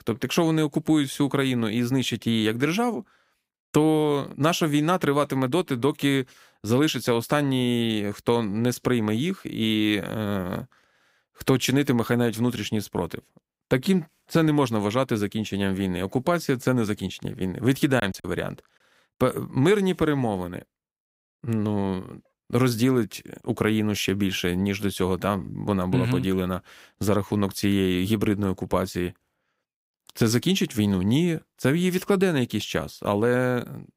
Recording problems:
choppy; occasionally; at 18 s; 3% of the speech affected

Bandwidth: 15.5 kHz